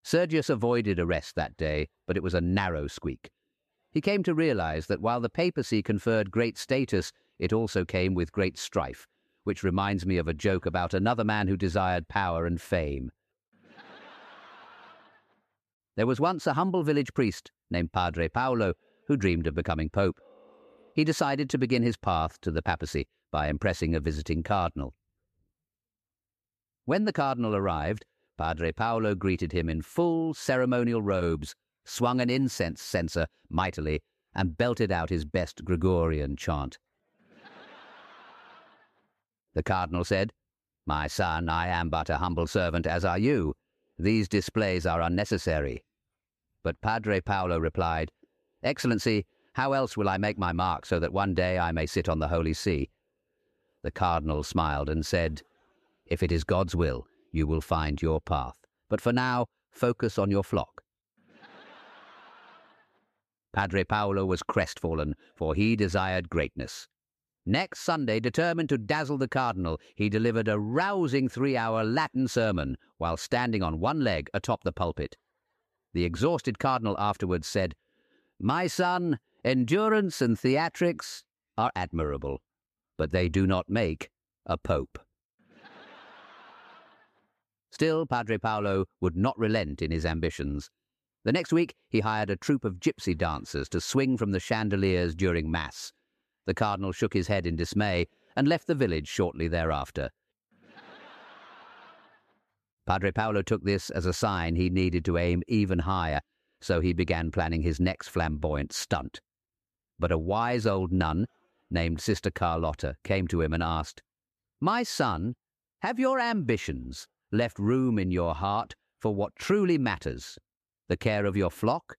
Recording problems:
none

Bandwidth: 14.5 kHz